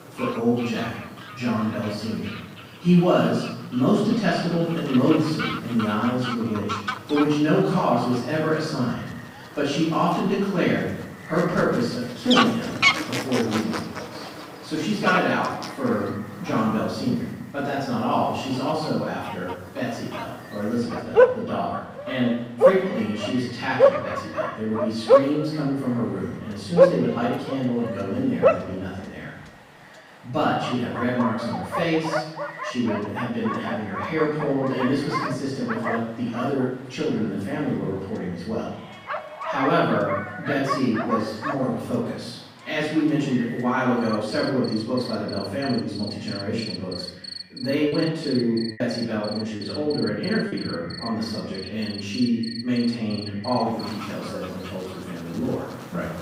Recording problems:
room echo; strong; dies away in 0.9 s
off-mic speech; far
echo of what is said; faint; throughout; 290 ms later, 25 dB below the speech
animal sounds; loud; throughout; 3 dB below the speech
choppy; very; from 48 to 51 s; 7% of the speech affected

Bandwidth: 15.5 kHz